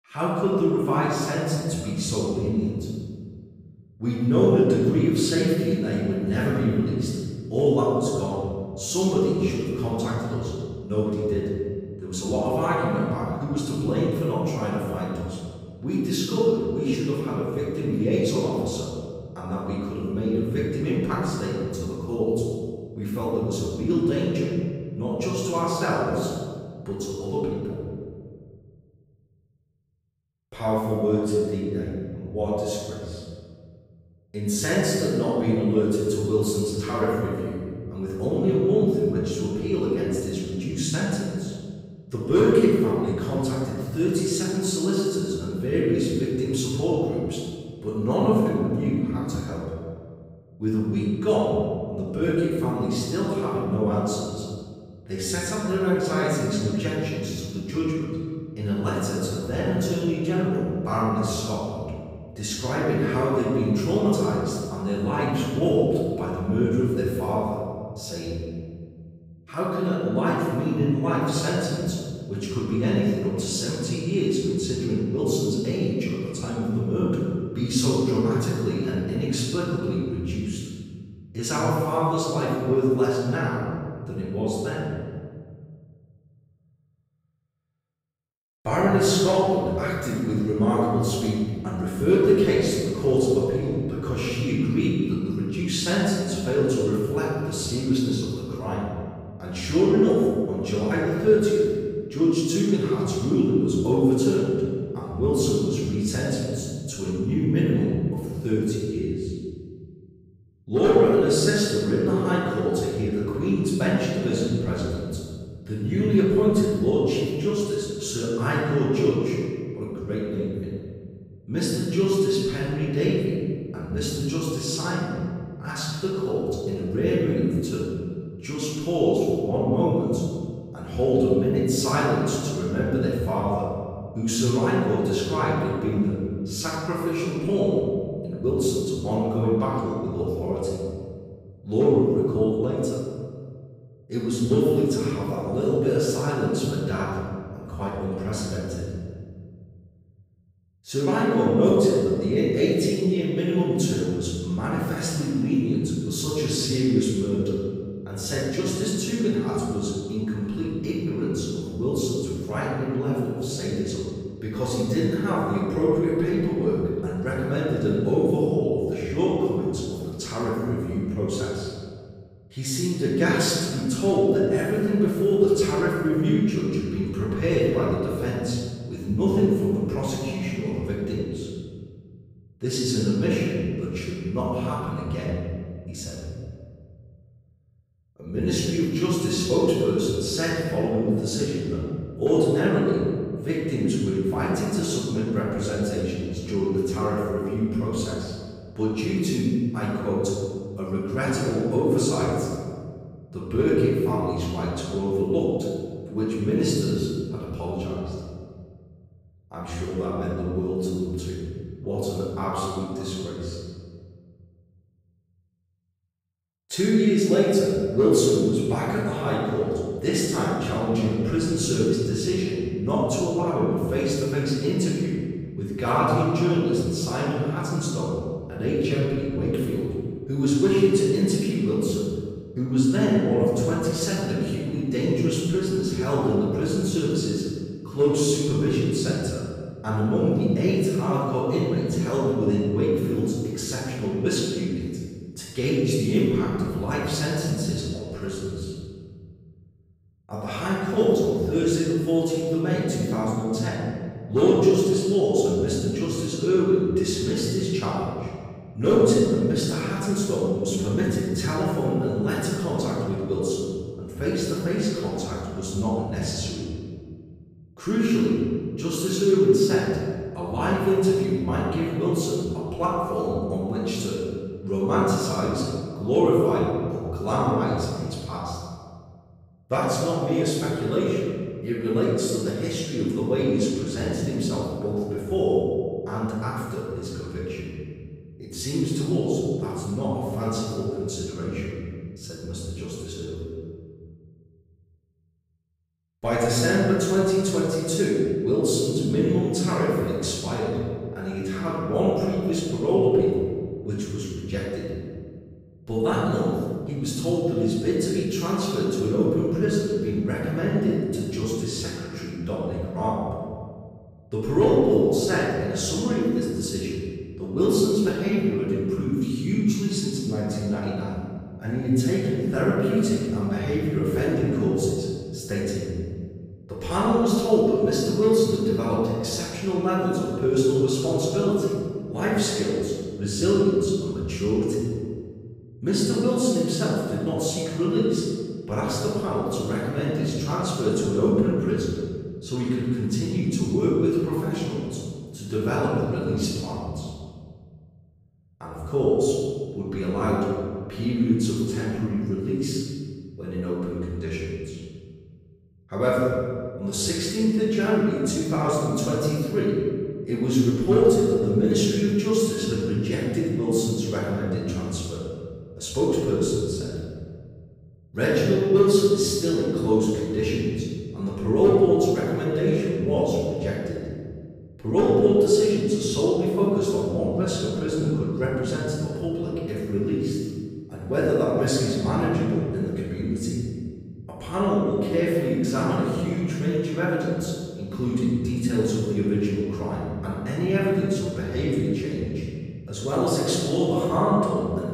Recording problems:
room echo; strong; dies away in 2 s
off-mic speech; far

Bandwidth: 15.5 kHz